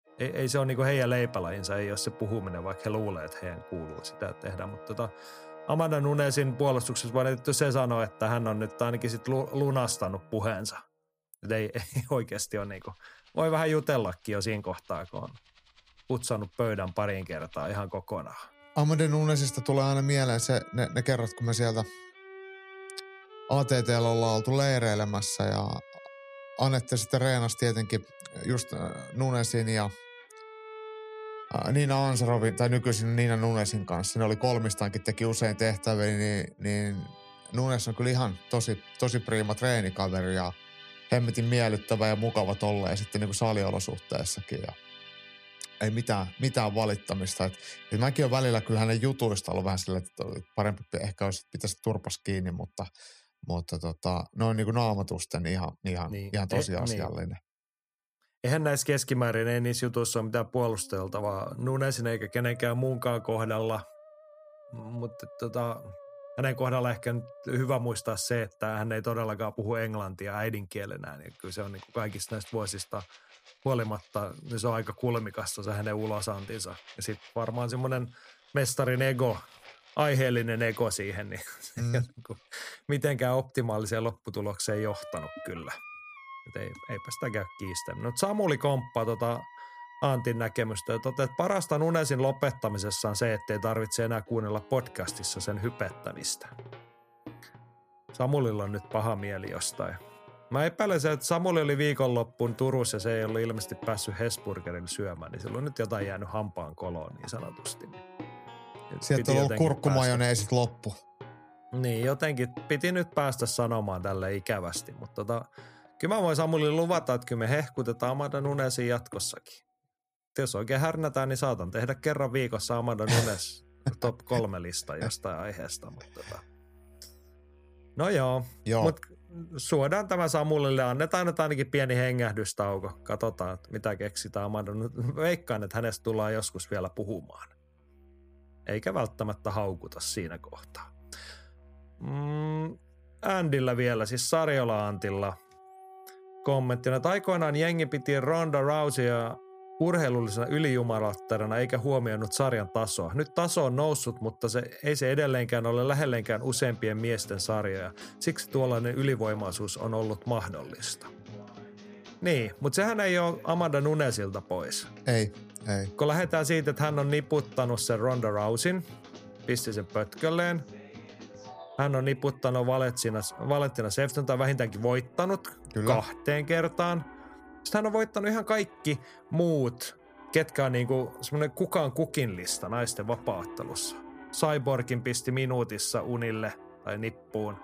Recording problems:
background music; noticeable; throughout; 20 dB below the speech

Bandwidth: 15 kHz